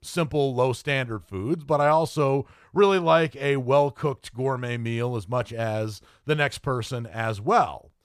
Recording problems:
none

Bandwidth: 14.5 kHz